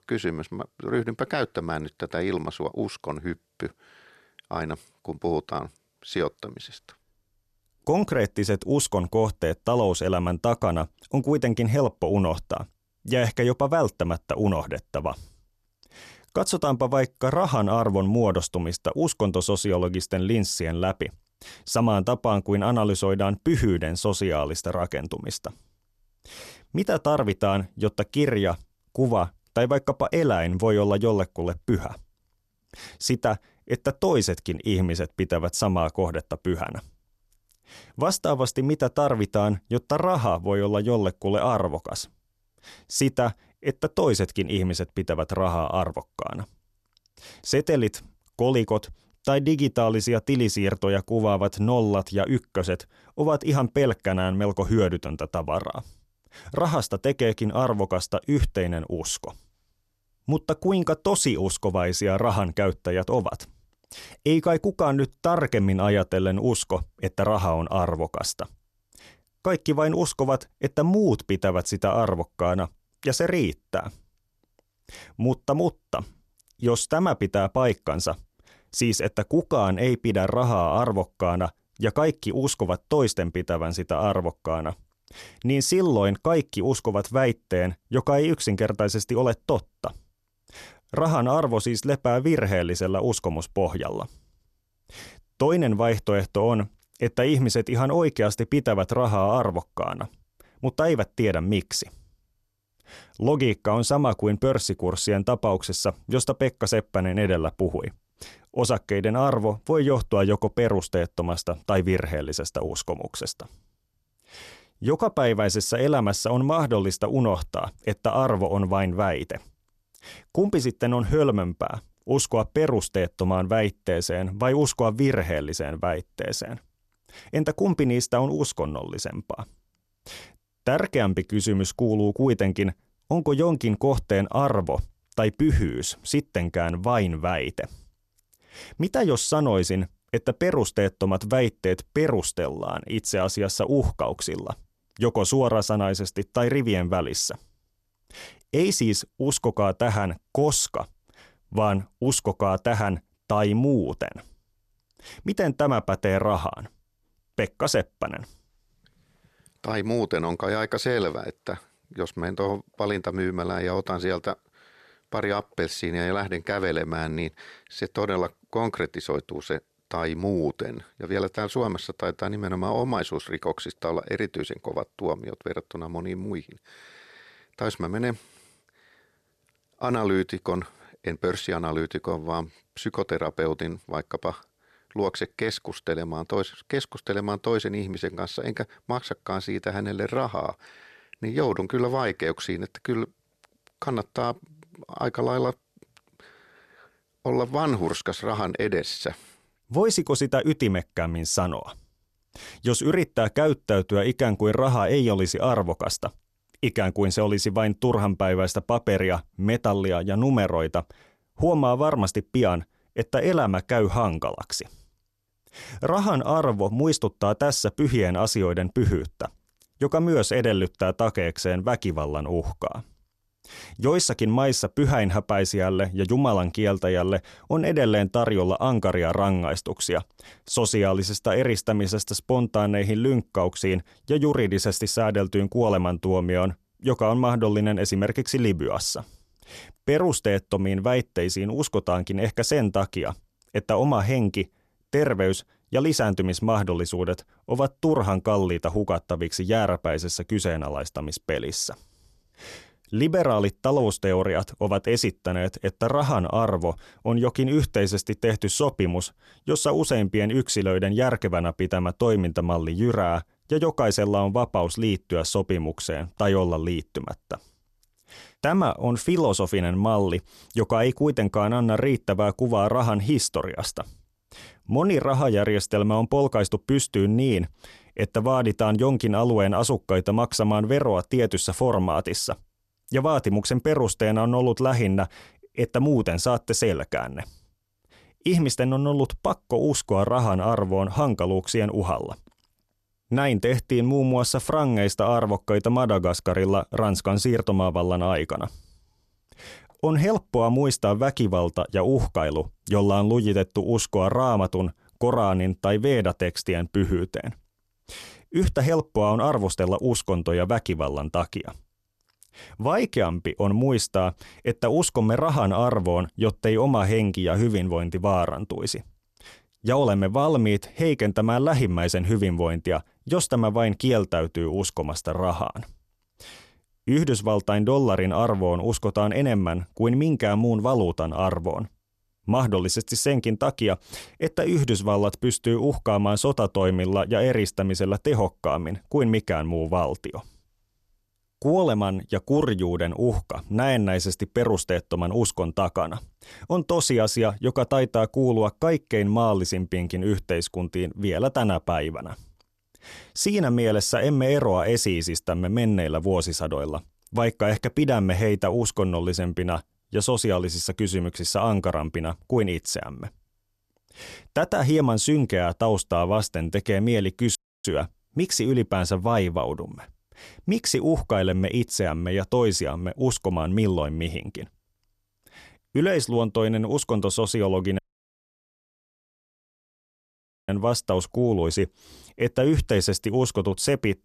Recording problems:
audio cutting out; at 6:07 and at 6:18 for 2.5 s

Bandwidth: 13.5 kHz